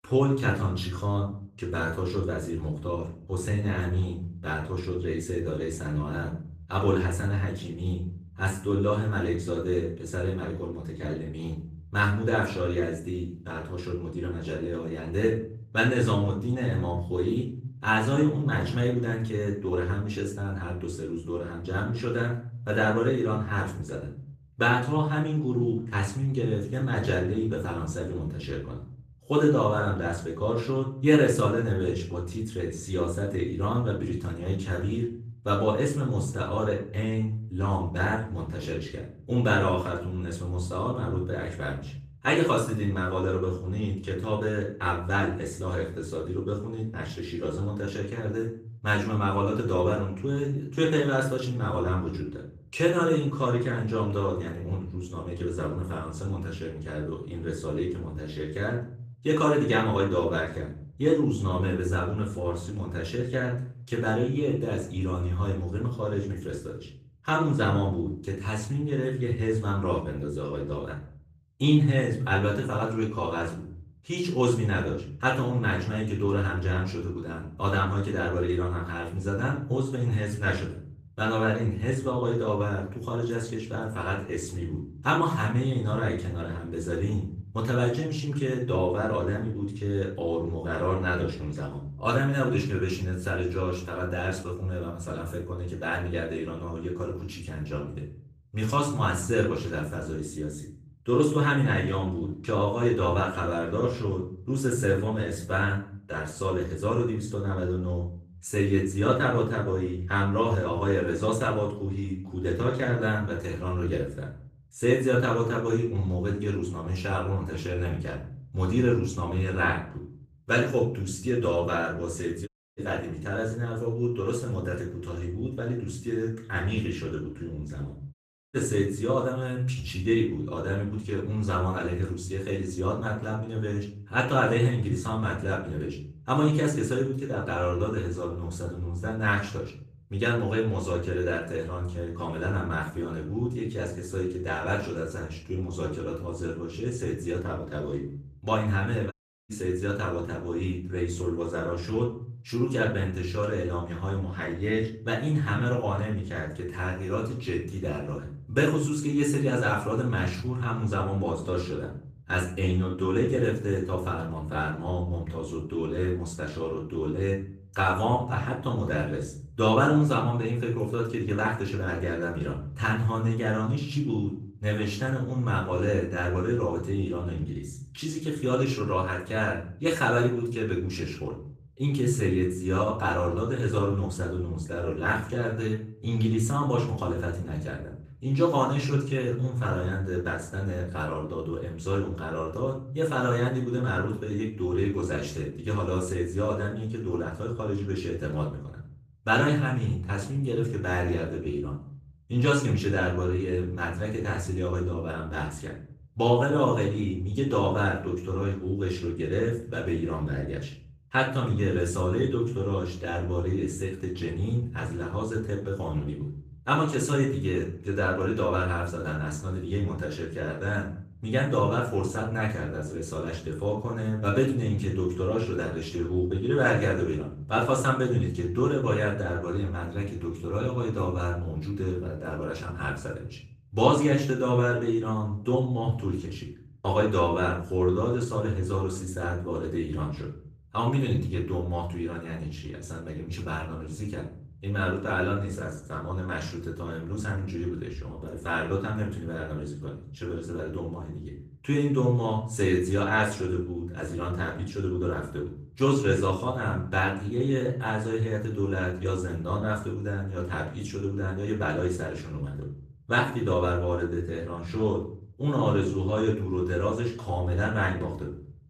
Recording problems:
off-mic speech; far
room echo; slight; dies away in 0.5 s
garbled, watery; slightly; nothing above 14.5 kHz
audio cutting out; at 2:02, at 2:08 and at 2:29

